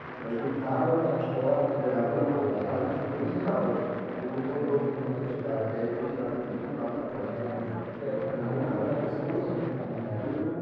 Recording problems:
room echo; strong; dies away in 2.5 s
off-mic speech; far
muffled; very; fading above 3.5 kHz
chatter from many people; loud; throughout; 1 dB below the speech
background music; very faint; throughout; 25 dB below the speech

